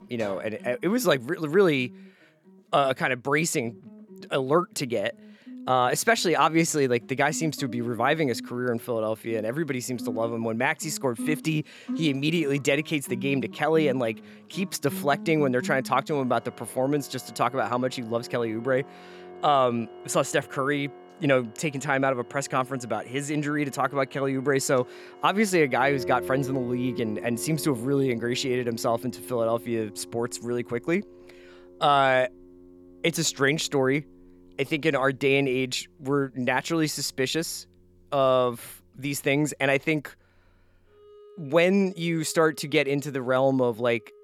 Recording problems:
background music; noticeable; throughout; 15 dB below the speech

